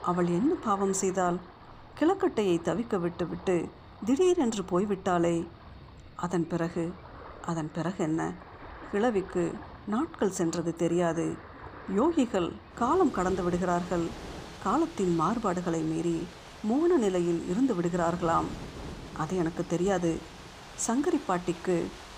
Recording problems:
rain or running water; noticeable; throughout; 15 dB below the speech

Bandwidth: 15 kHz